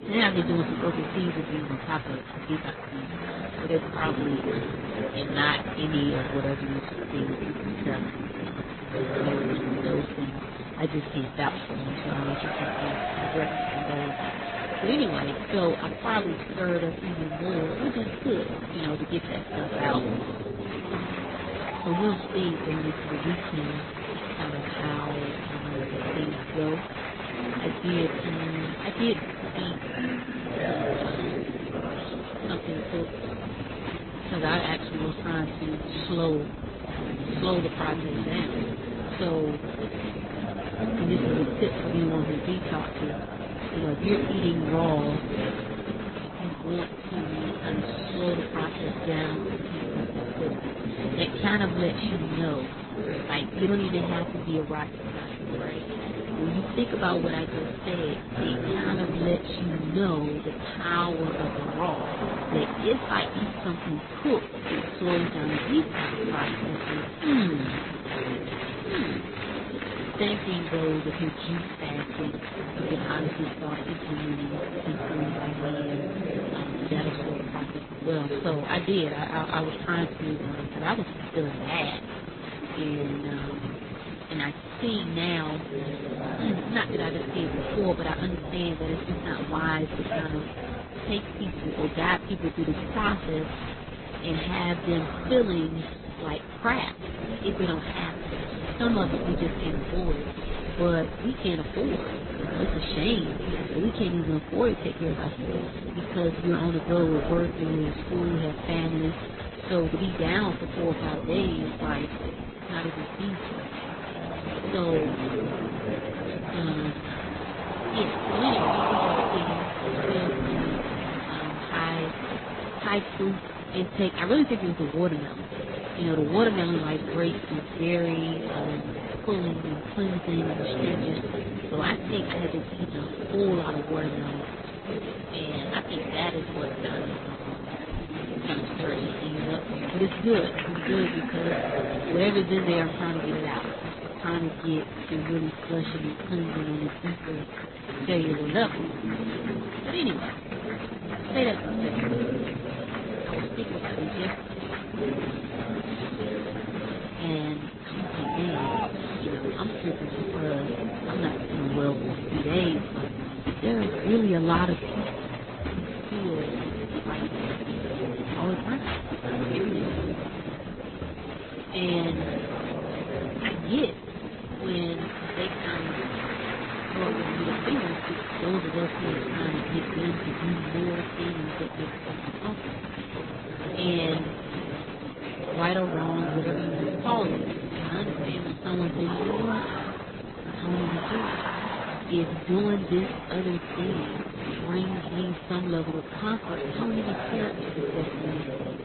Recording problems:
garbled, watery; badly; nothing above 4 kHz
murmuring crowd; loud; throughout; 3 dB below the speech

